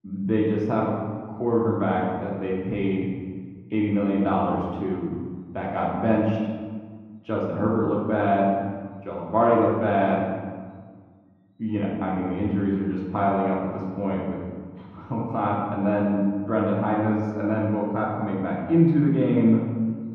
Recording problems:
off-mic speech; far
muffled; very; fading above 3.5 kHz
room echo; noticeable; dies away in 1.4 s

